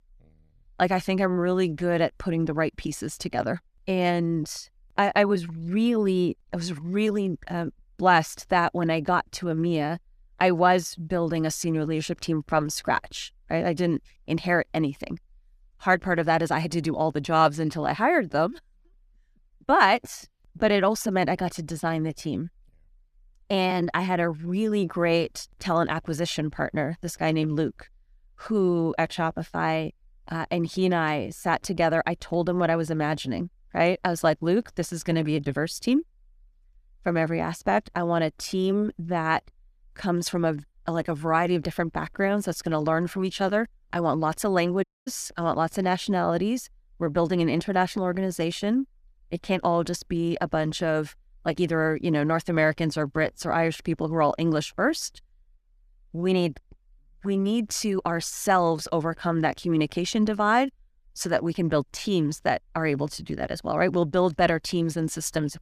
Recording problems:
audio cutting out; at 45 s

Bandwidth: 14.5 kHz